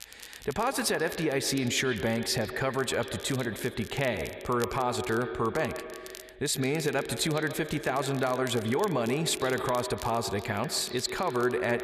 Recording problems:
echo of what is said; strong; throughout; 140 ms later, 9 dB below the speech
crackle, like an old record; noticeable; 15 dB below the speech

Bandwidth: 14 kHz